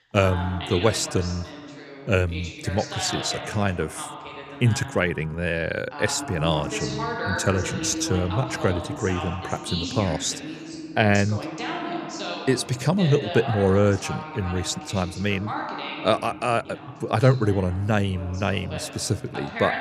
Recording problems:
voice in the background; loud; throughout; 8 dB below the speech

